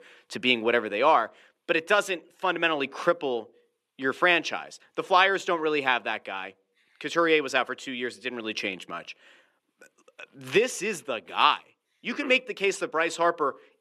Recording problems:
thin; somewhat; fading below 400 Hz

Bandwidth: 13.5 kHz